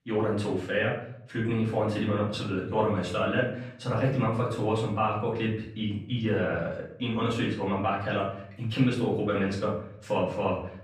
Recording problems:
off-mic speech; far
room echo; noticeable; dies away in 0.5 s

